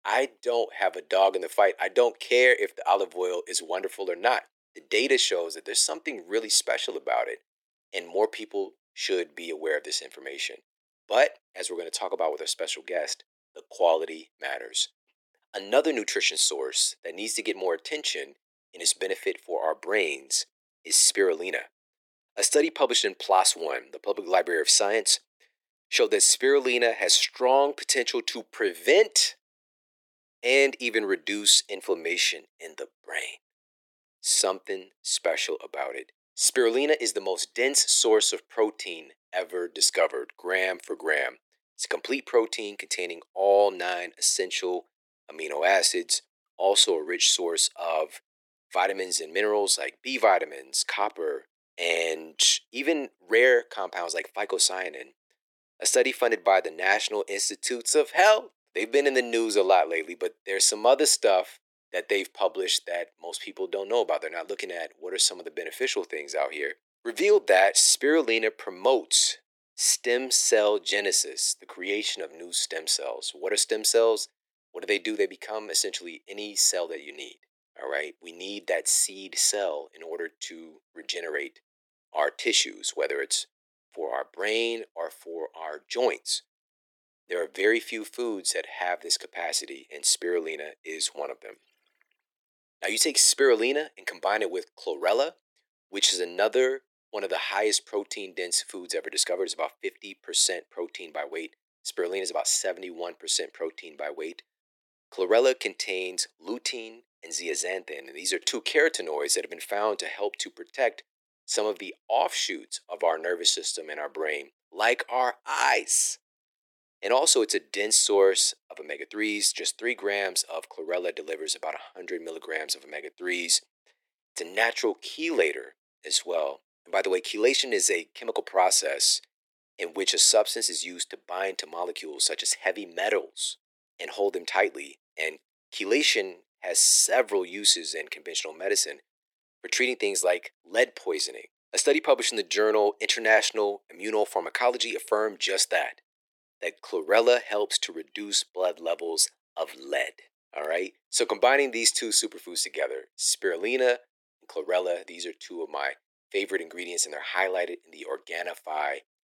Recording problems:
thin; very; fading below 350 Hz

